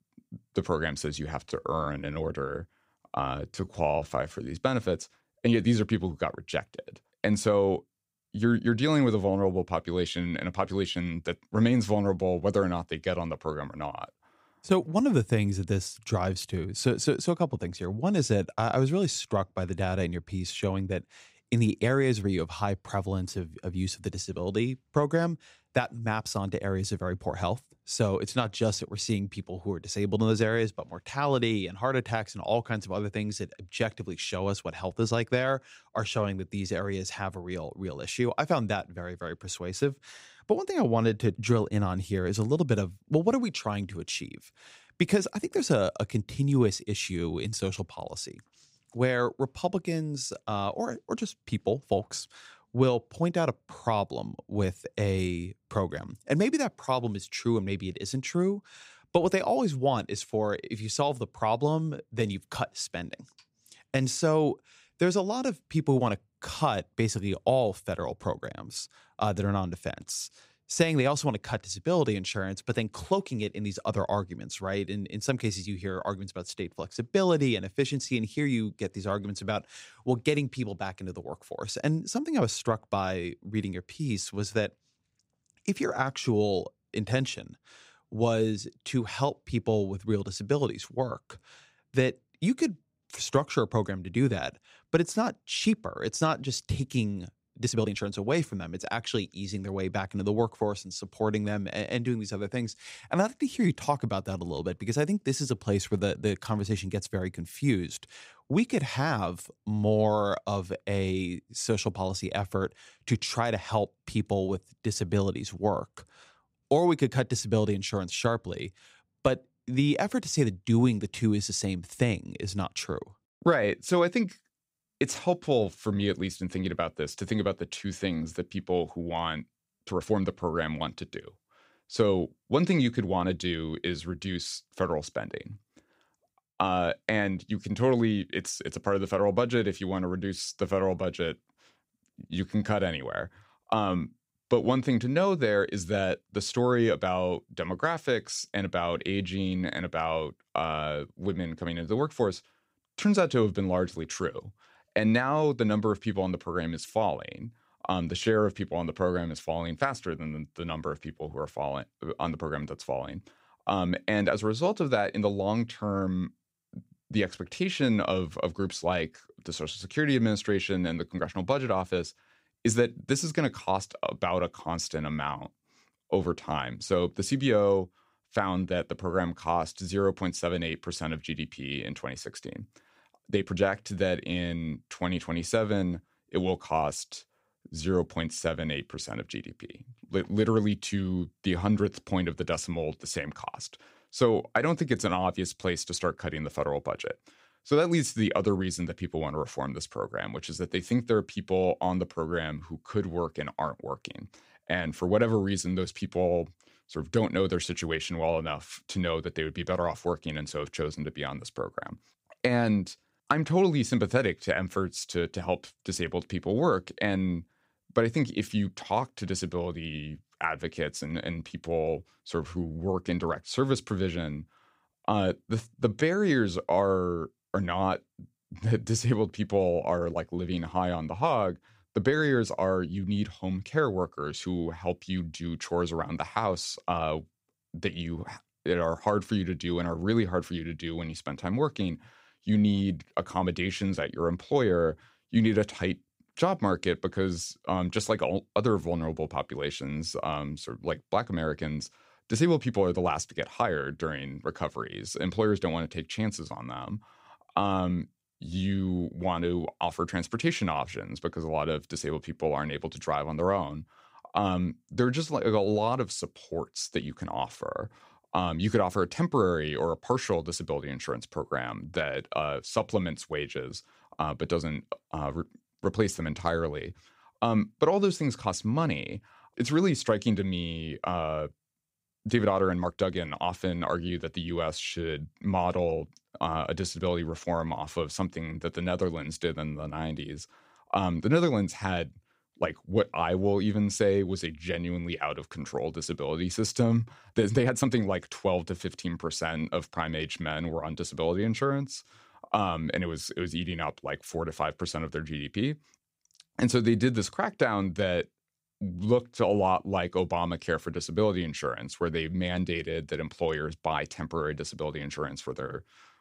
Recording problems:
uneven, jittery; strongly; from 1.5 s to 4:58

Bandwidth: 15.5 kHz